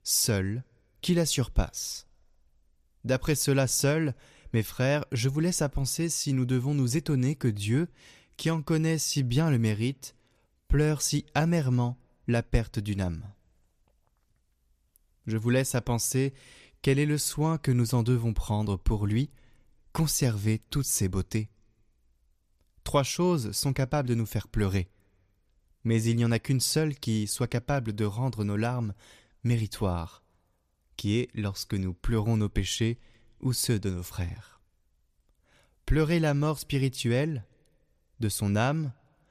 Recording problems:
none

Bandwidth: 14.5 kHz